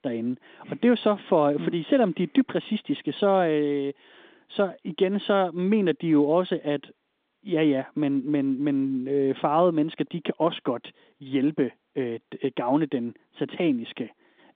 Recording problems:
phone-call audio; nothing above 3.5 kHz

